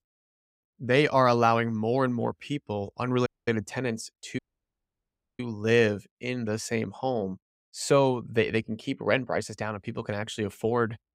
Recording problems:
audio cutting out; at 3.5 s and at 4.5 s for 1 s

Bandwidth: 15.5 kHz